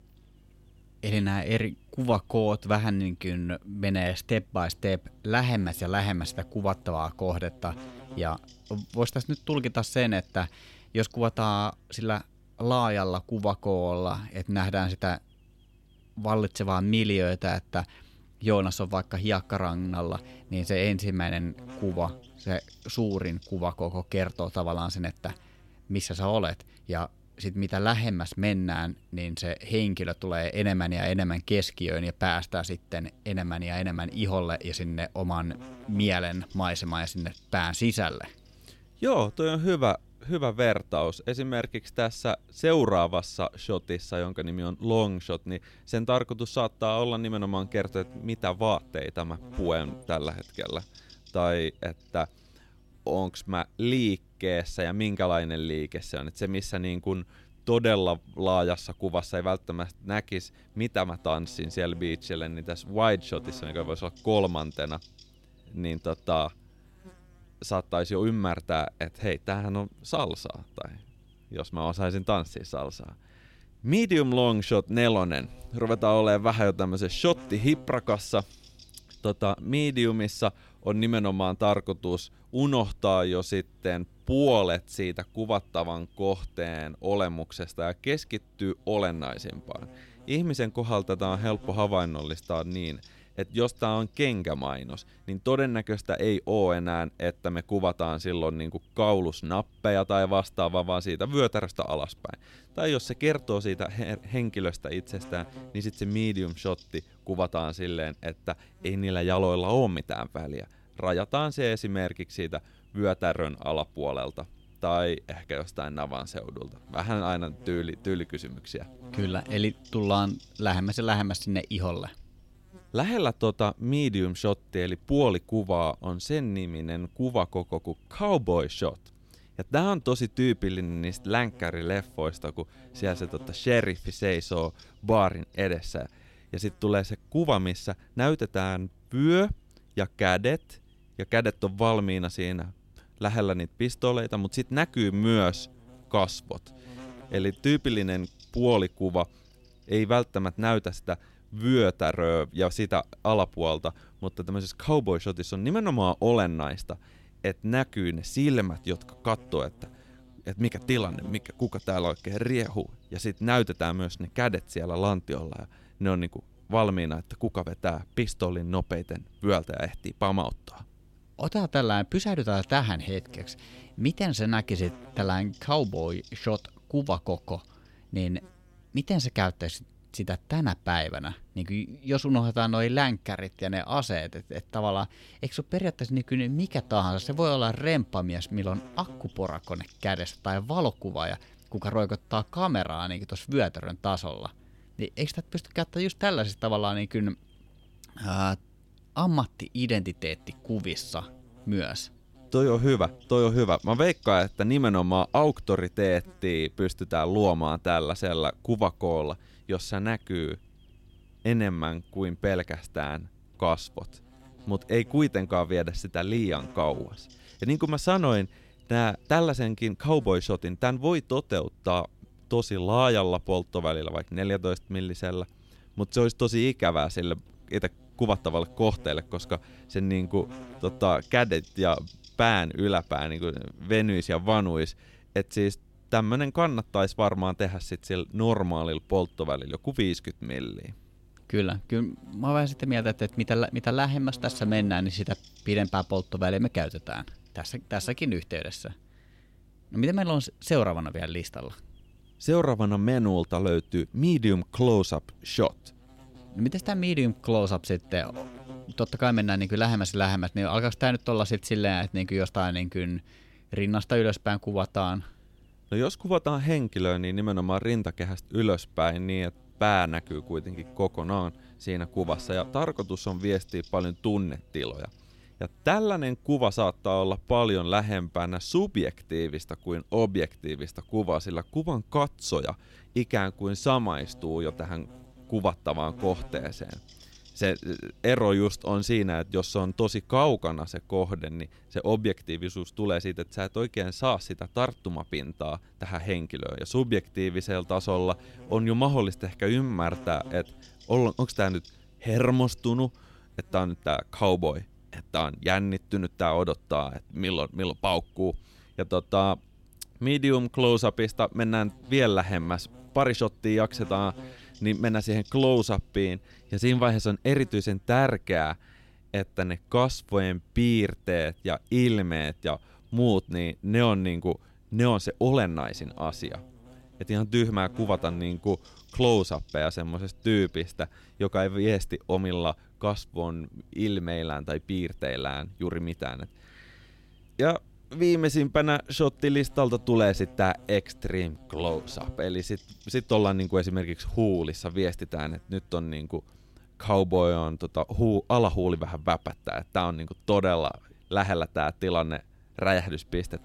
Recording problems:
electrical hum; faint; throughout; 50 Hz, 25 dB below the speech

